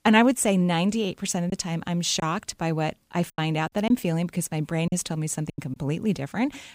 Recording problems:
choppy; very; from 1.5 to 6 s; 6% of the speech affected

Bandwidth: 15.5 kHz